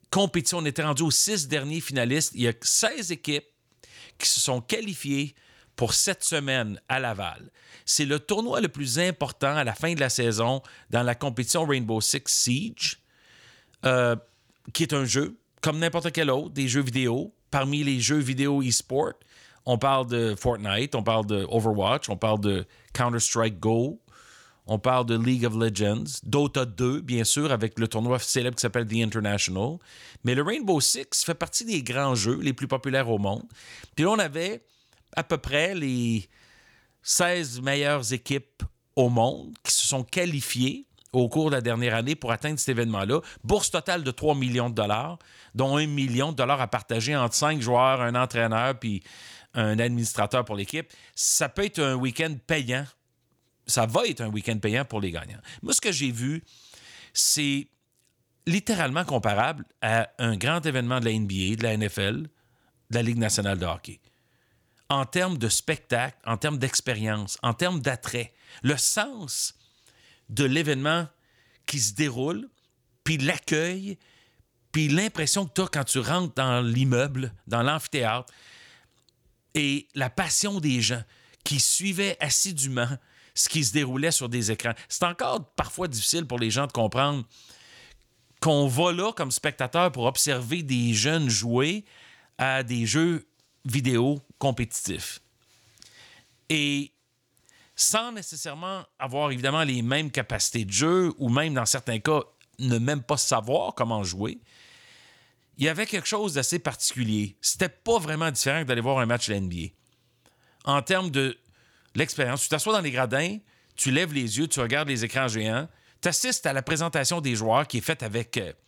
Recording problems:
none

